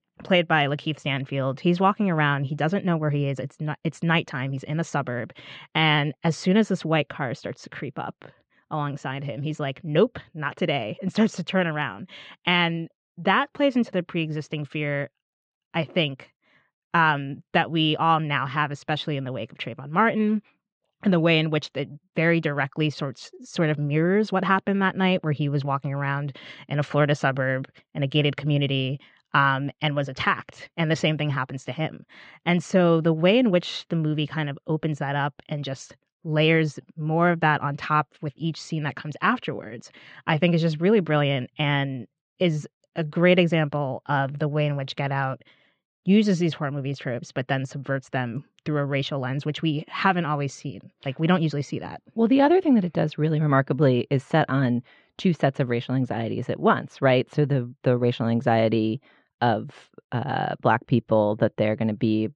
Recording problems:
muffled; very; fading above 4 kHz

